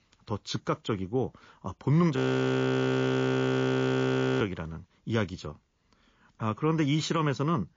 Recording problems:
garbled, watery; slightly
audio freezing; at 2 s for 2 s

